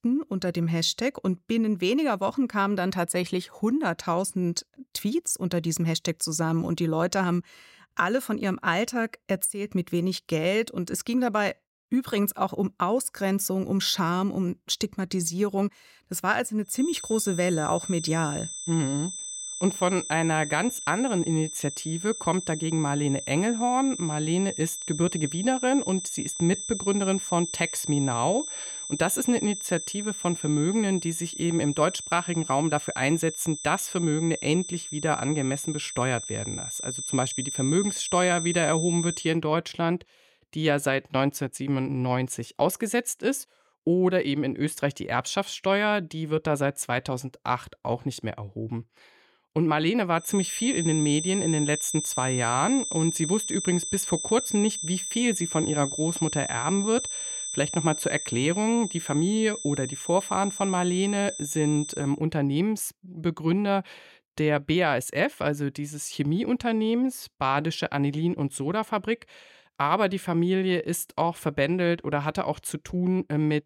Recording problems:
high-pitched whine; loud; from 17 to 39 s and from 50 s to 1:02; 8 kHz, 6 dB below the speech

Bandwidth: 16 kHz